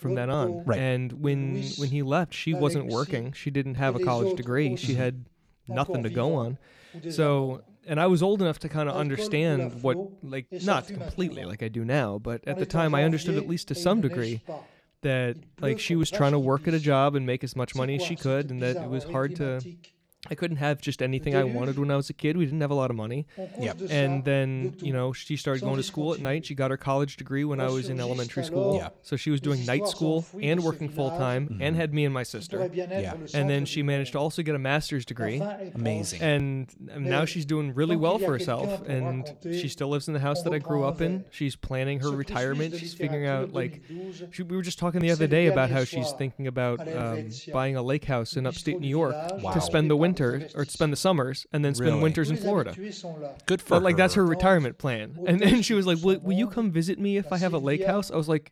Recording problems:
voice in the background; loud; throughout; 9 dB below the speech

